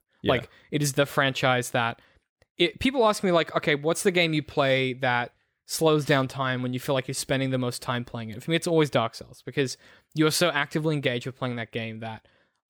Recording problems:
none

